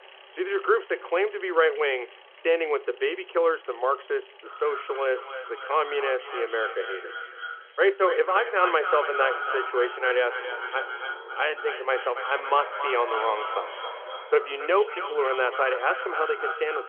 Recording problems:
echo of what is said; strong; from 4.5 s on; 280 ms later, 7 dB below the speech
phone-call audio; nothing above 3.5 kHz
traffic noise; noticeable; throughout; 20 dB below the speech

